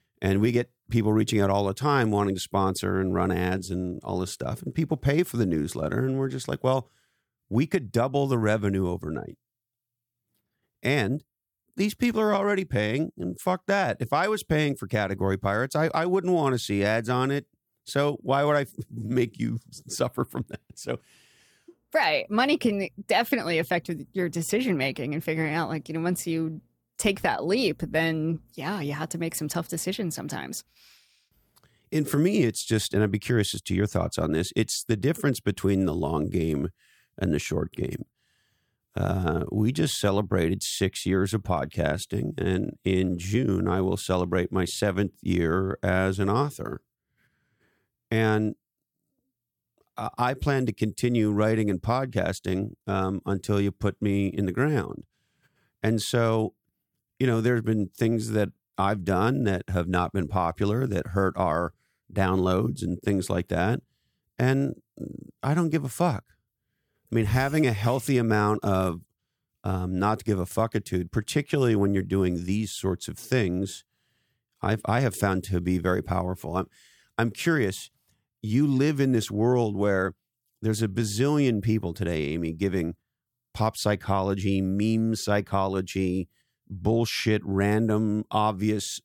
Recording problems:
none

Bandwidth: 17 kHz